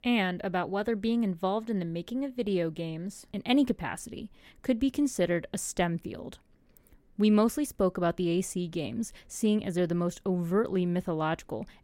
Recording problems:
none

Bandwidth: 16 kHz